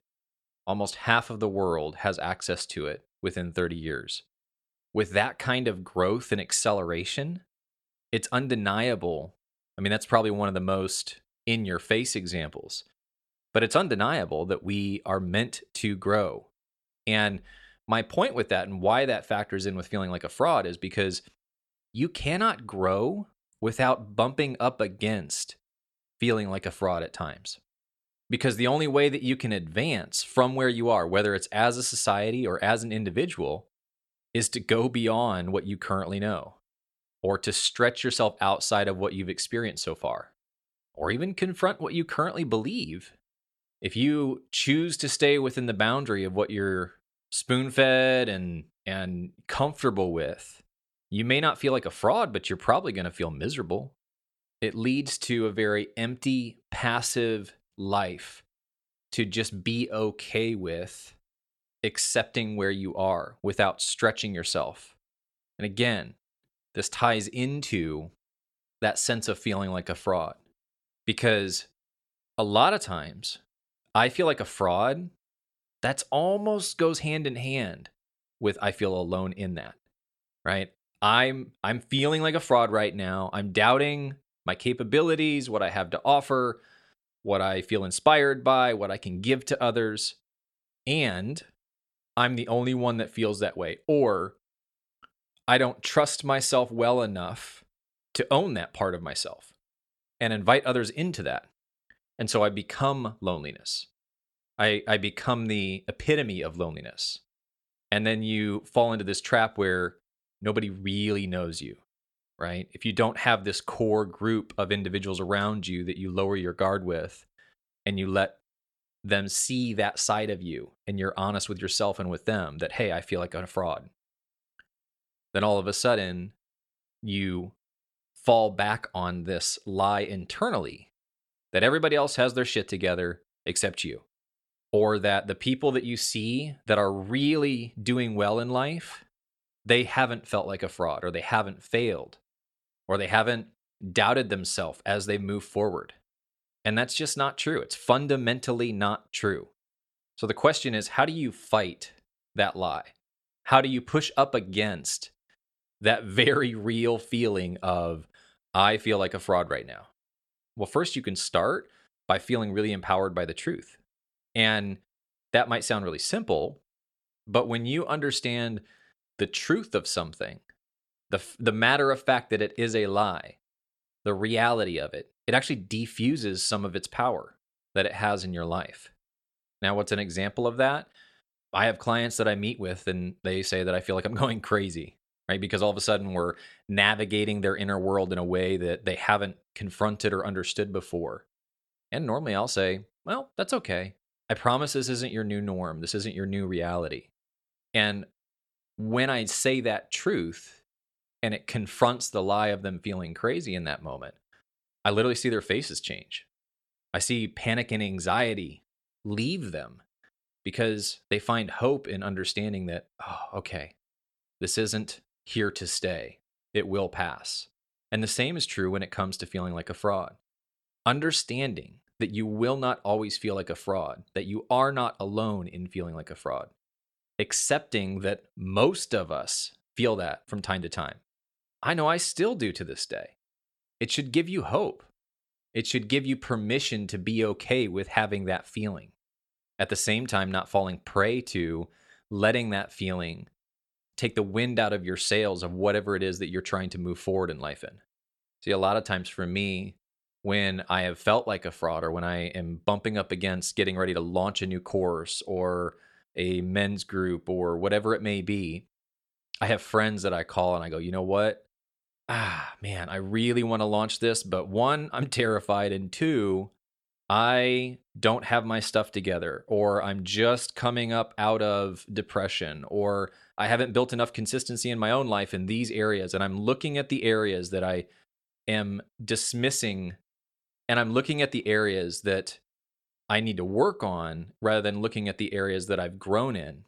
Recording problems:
none

